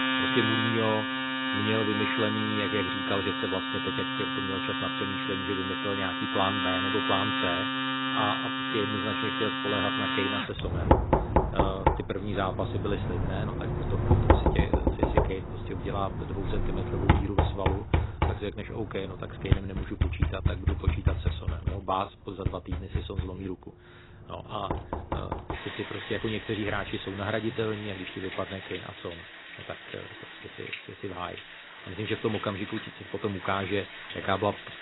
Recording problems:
garbled, watery; badly; nothing above 4 kHz
household noises; very loud; throughout; 4 dB above the speech

